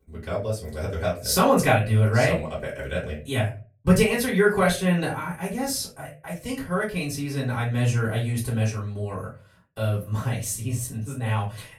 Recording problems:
off-mic speech; far
room echo; slight; dies away in 0.3 s

